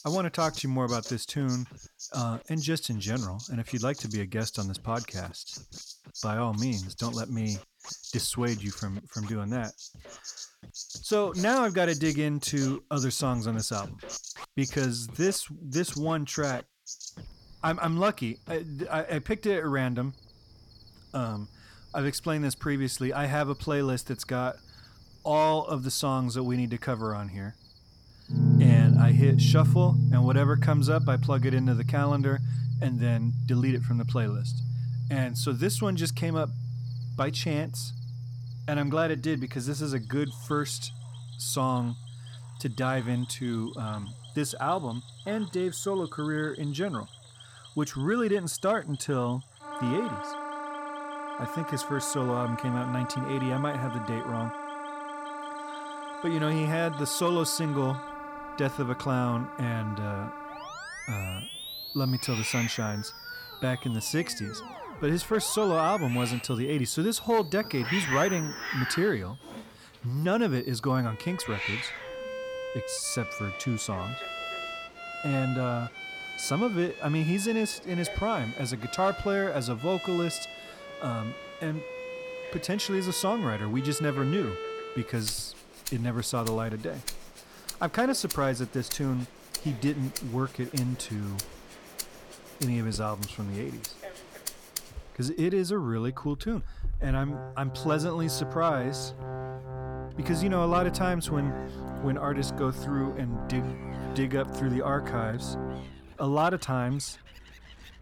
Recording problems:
background music; loud; throughout; 3 dB below the speech
animal sounds; noticeable; throughout; 15 dB below the speech

